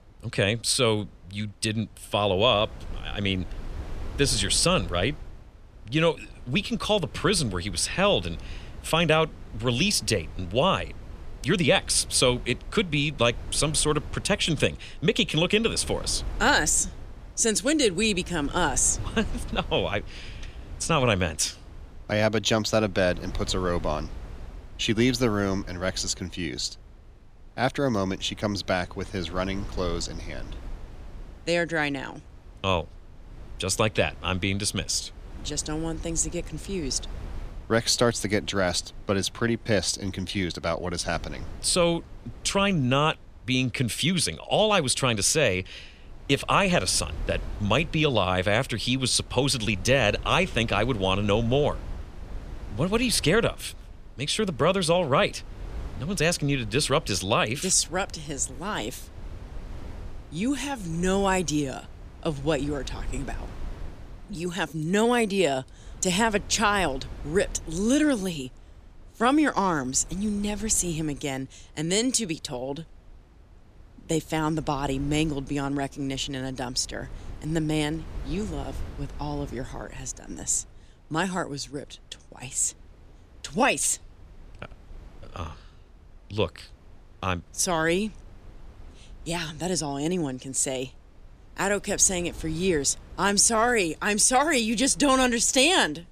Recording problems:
wind noise on the microphone; occasional gusts; 25 dB below the speech

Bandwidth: 14.5 kHz